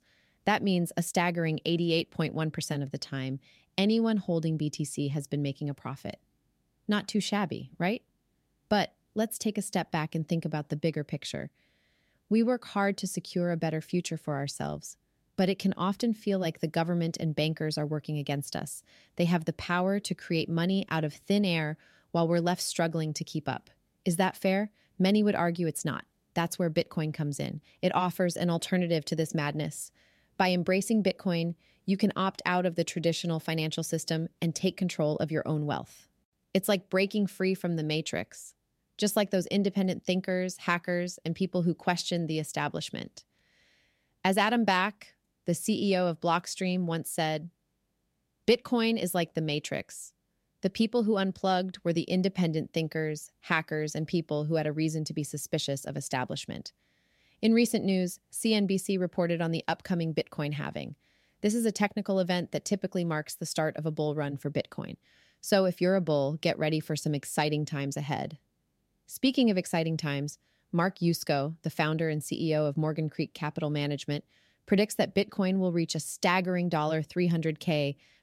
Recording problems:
none

